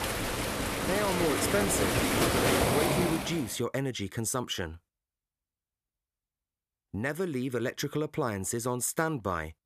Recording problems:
rain or running water; very loud; until 3 s; 4 dB above the speech

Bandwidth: 14.5 kHz